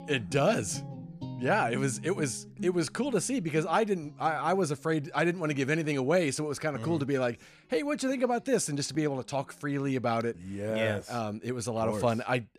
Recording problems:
background music; noticeable; throughout; 15 dB below the speech

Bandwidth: 14.5 kHz